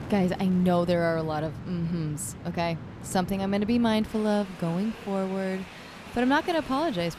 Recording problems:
train or aircraft noise; noticeable; throughout; 15 dB below the speech

